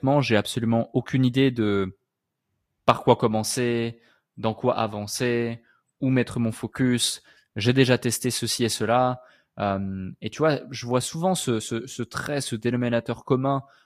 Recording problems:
garbled, watery; slightly; nothing above 14.5 kHz

